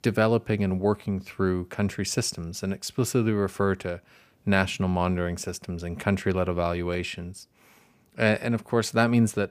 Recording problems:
none

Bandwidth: 15 kHz